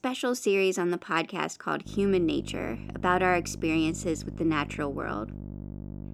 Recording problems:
electrical hum; faint; from 2 s on; 50 Hz, 20 dB below the speech

